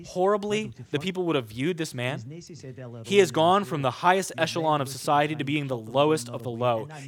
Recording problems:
voice in the background; noticeable; throughout; 15 dB below the speech

